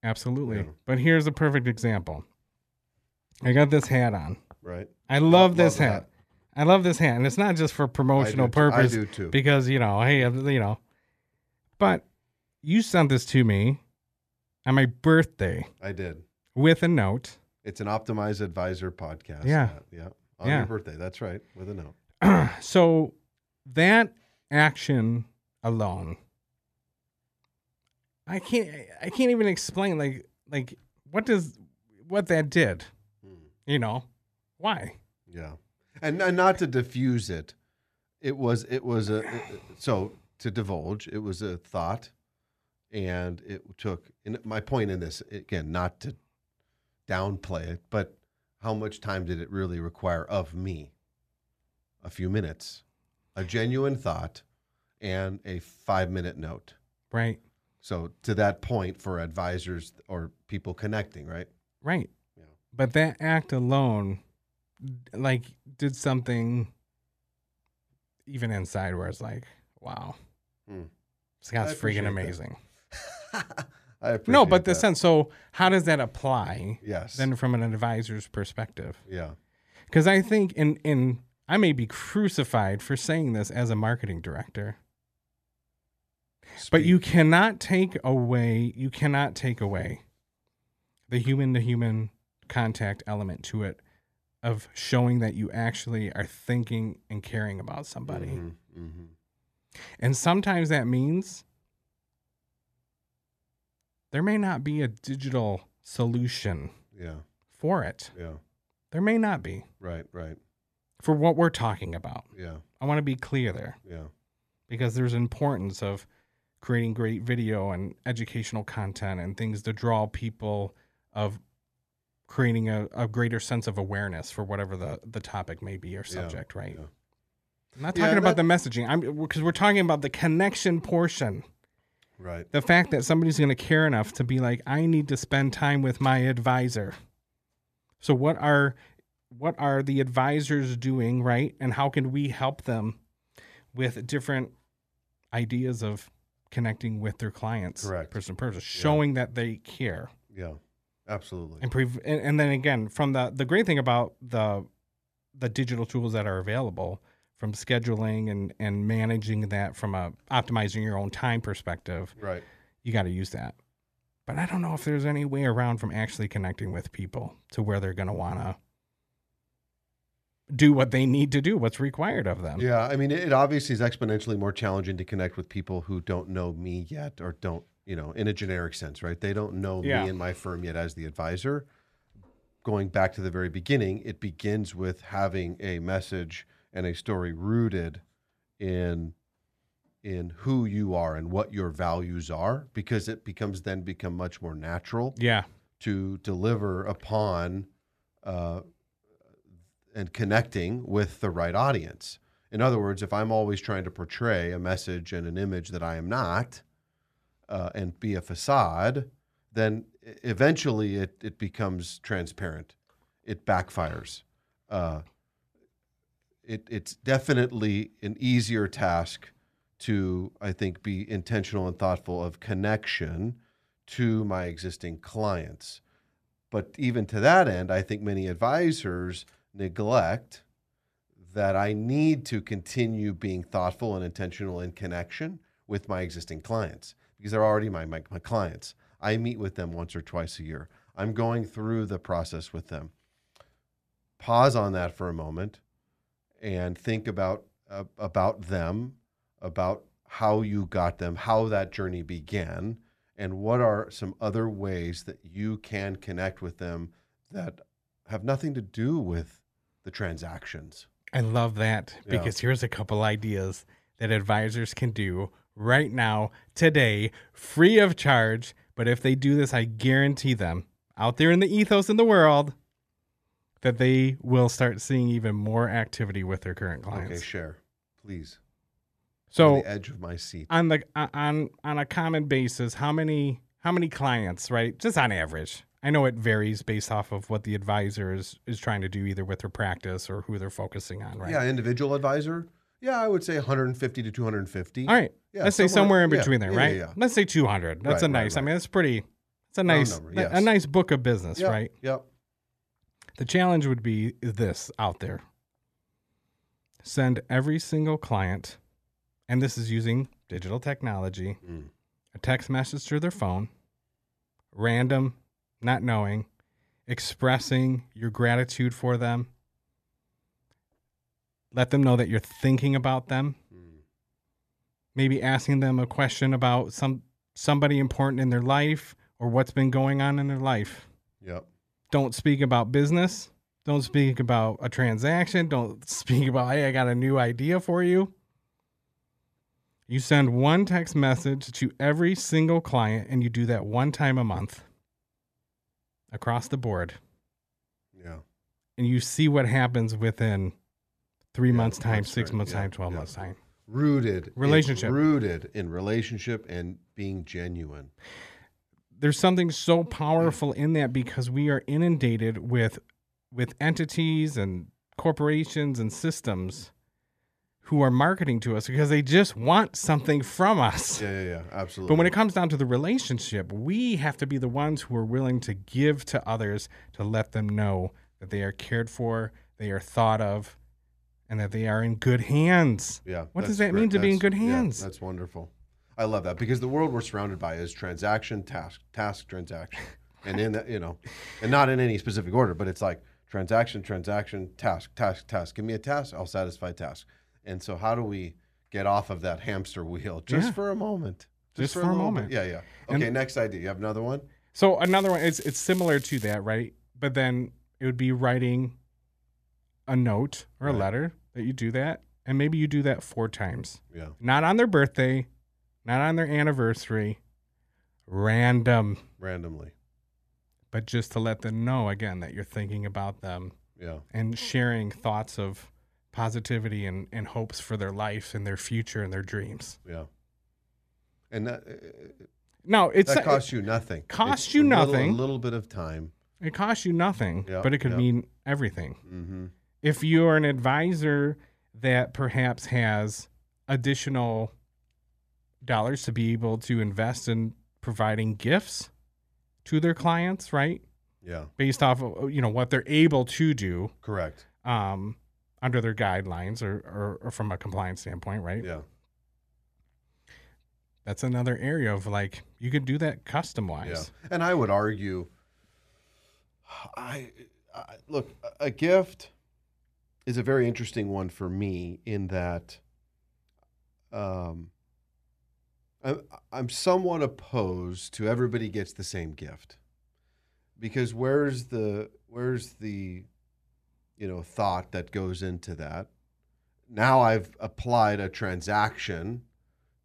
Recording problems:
crackling; noticeable; from 6:45 to 6:46; 15 dB below the speech

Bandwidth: 14.5 kHz